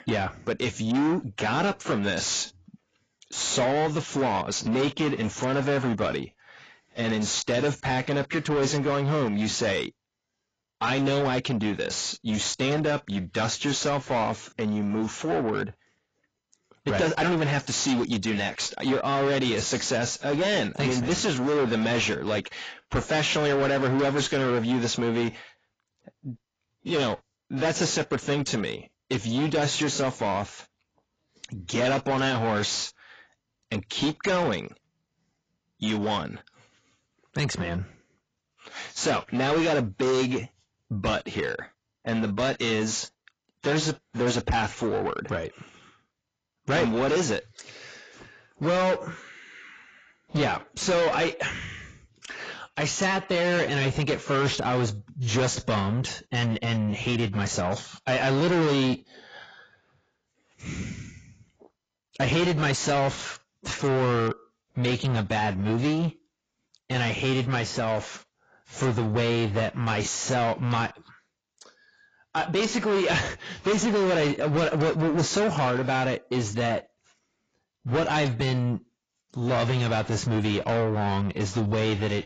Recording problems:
distortion; heavy; 6 dB below the speech
garbled, watery; badly; nothing above 7.5 kHz

